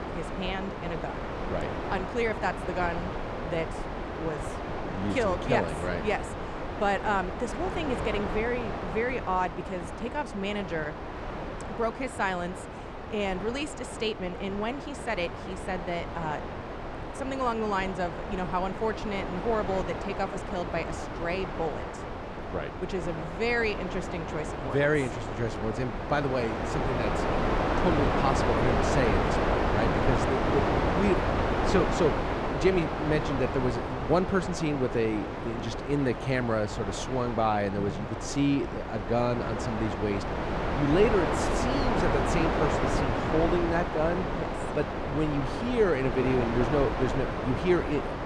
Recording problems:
wind noise on the microphone; heavy; 1 dB below the speech

